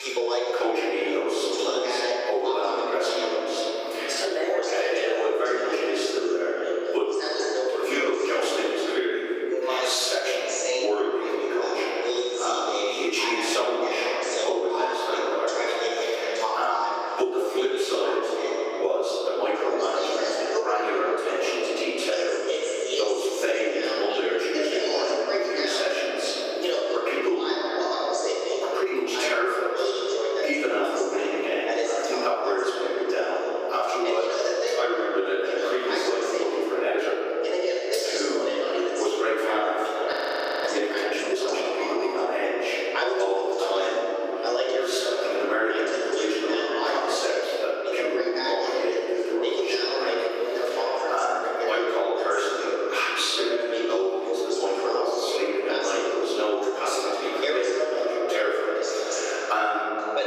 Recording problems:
room echo; strong; dies away in 1.9 s
off-mic speech; far
thin; very; fading below 350 Hz
squashed, flat; somewhat
voice in the background; loud; throughout; 3 dB below the speech
audio freezing; at 40 s for 0.5 s

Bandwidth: 15.5 kHz